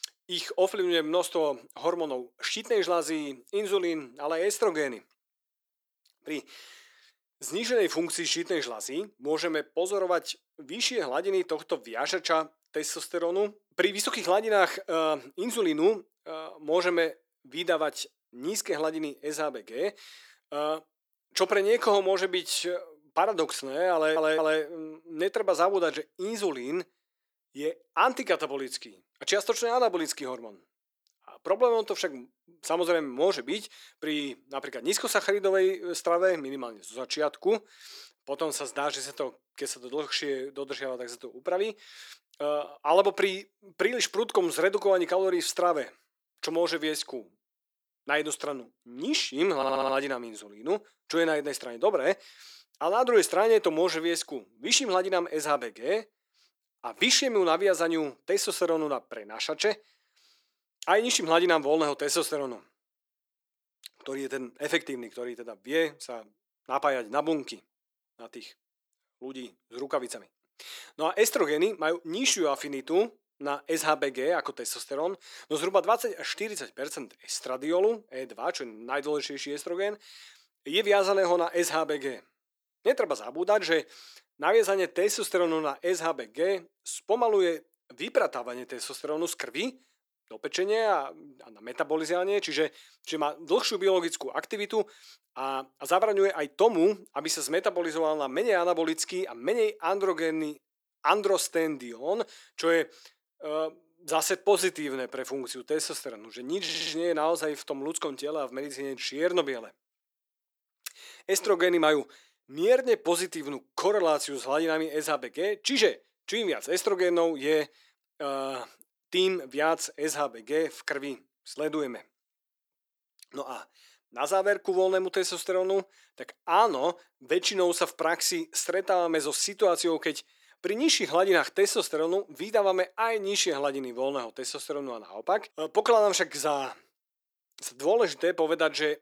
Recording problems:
thin; very; fading below 350 Hz
audio stuttering; at 24 s, at 50 s and at 1:47

